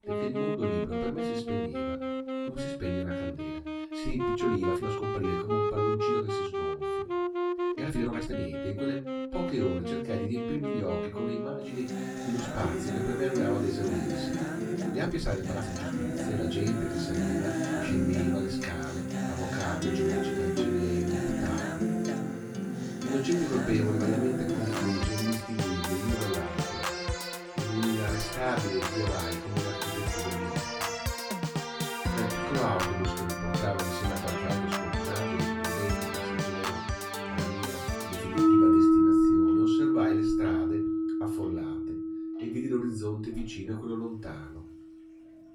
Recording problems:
off-mic speech; far
room echo; slight; dies away in 0.3 s
background music; very loud; throughout; 4 dB above the speech
household noises; faint; throughout; 30 dB below the speech
uneven, jittery; strongly; from 4 to 35 s

